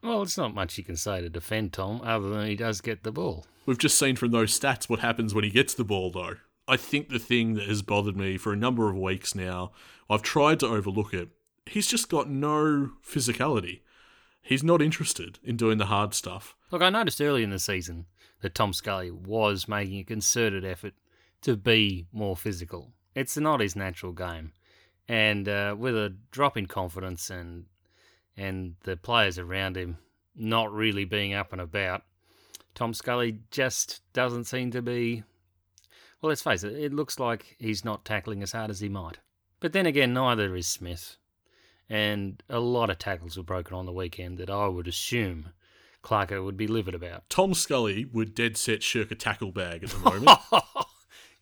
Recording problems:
none

